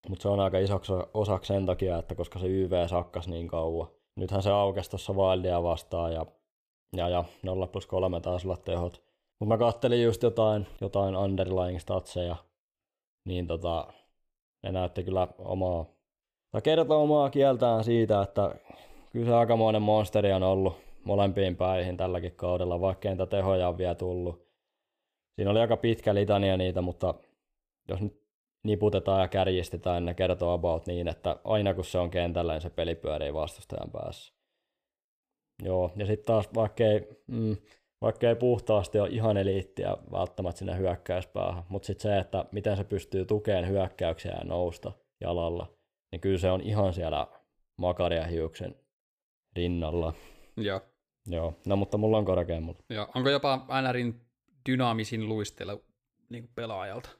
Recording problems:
none

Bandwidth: 15 kHz